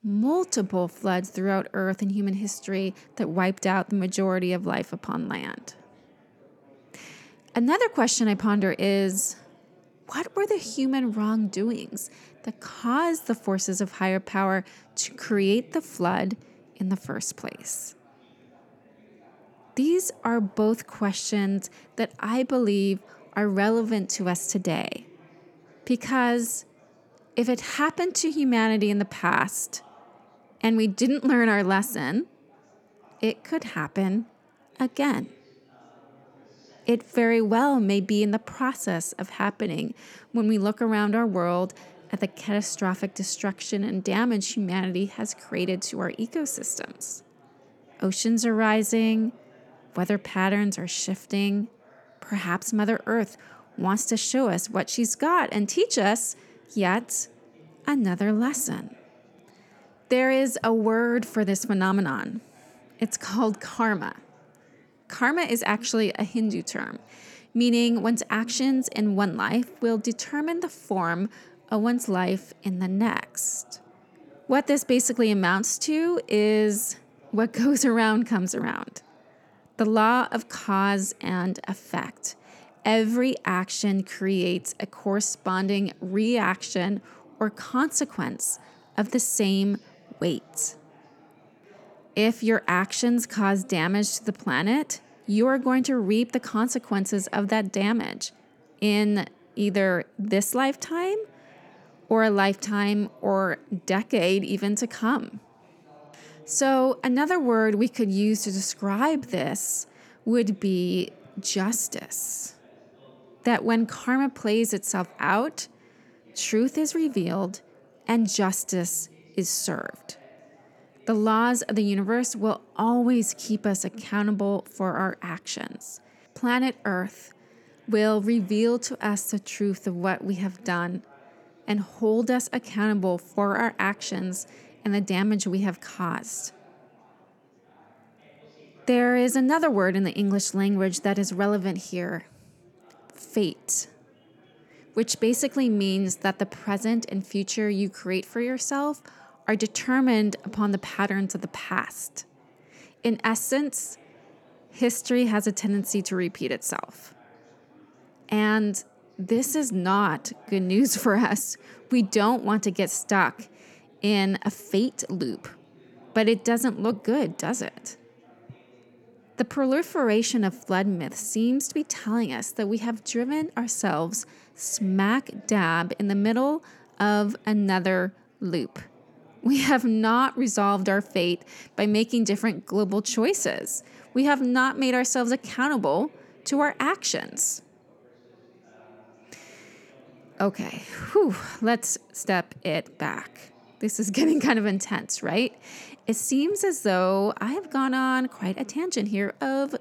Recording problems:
chatter from many people; faint; throughout; 30 dB below the speech

